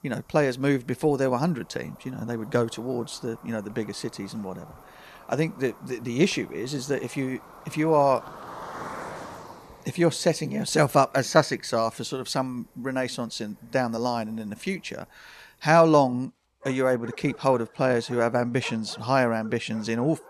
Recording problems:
animal sounds; noticeable; throughout; 20 dB below the speech

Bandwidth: 13.5 kHz